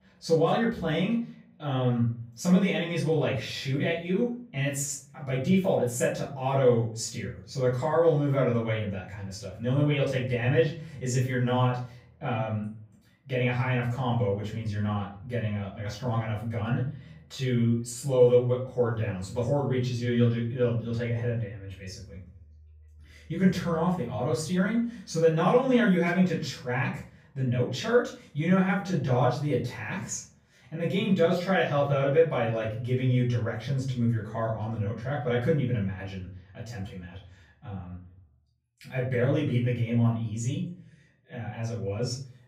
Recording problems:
off-mic speech; far
room echo; noticeable; dies away in 0.4 s

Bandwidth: 15.5 kHz